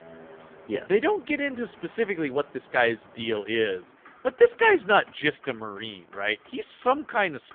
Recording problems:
phone-call audio; poor line; nothing above 3.5 kHz
traffic noise; faint; throughout; 25 dB below the speech

